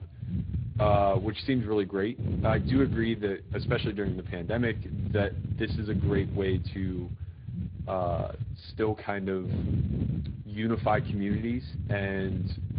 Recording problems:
high frequencies cut off; severe; nothing above 4.5 kHz
garbled, watery; slightly
wind noise on the microphone; occasional gusts; 15 dB below the speech

